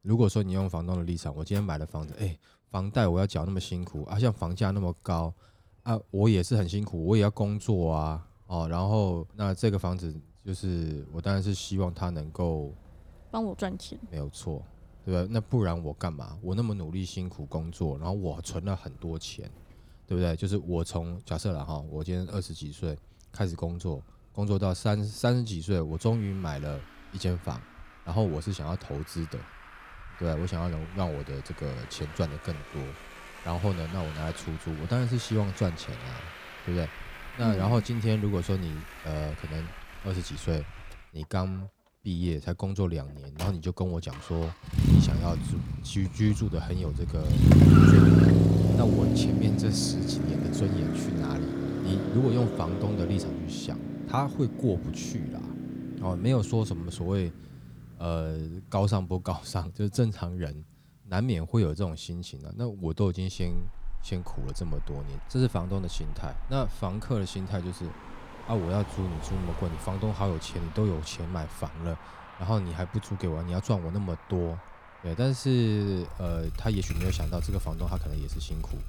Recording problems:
traffic noise; very loud; throughout; 4 dB above the speech

